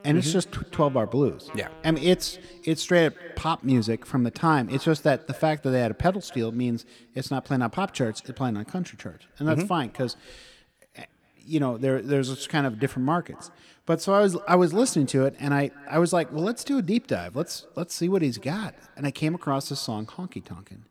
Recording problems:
echo of what is said; faint; throughout; 240 ms later, 25 dB below the speech
background music; faint; until 5 s; 25 dB below the speech

